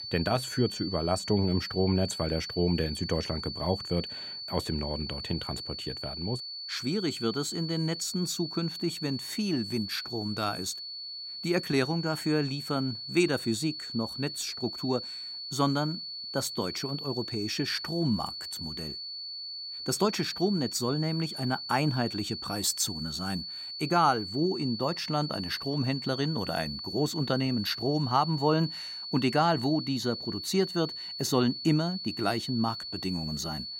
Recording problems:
high-pitched whine; loud; throughout; 4.5 kHz, 6 dB below the speech

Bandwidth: 16 kHz